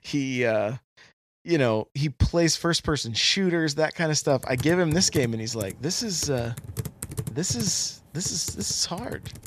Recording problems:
household noises; noticeable; from 4.5 s on; 15 dB below the speech

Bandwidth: 14.5 kHz